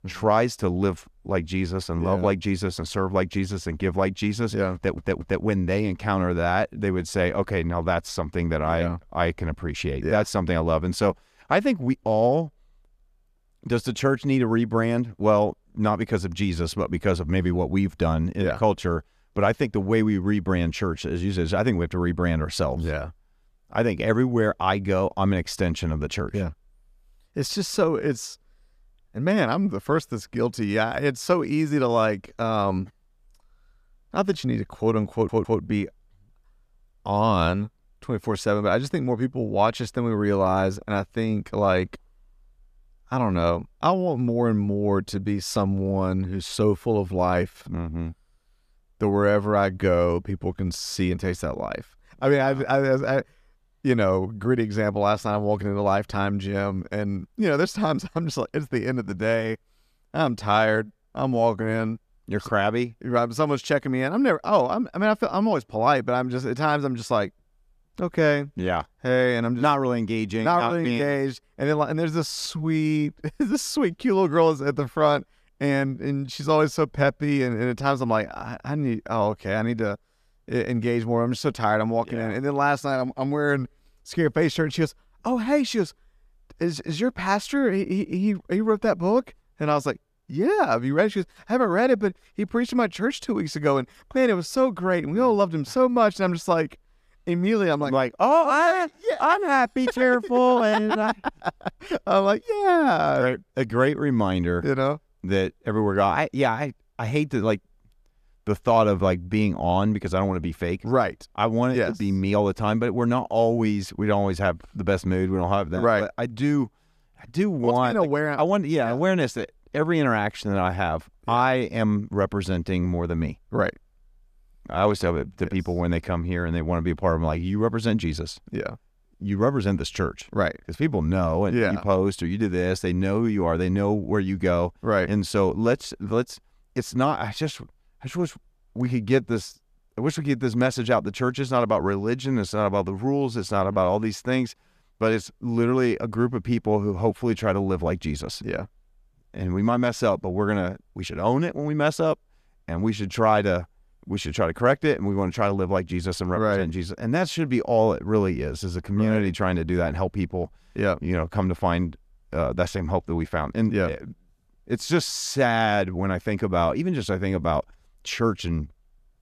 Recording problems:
audio stuttering; at 5 s and at 35 s

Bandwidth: 14.5 kHz